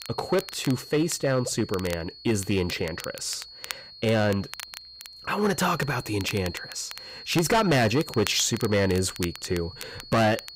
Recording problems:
distortion; heavy; 6% of the sound clipped
high-pitched whine; noticeable; throughout; 4.5 kHz, 15 dB below the speech
crackle, like an old record; noticeable; 15 dB below the speech

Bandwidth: 15.5 kHz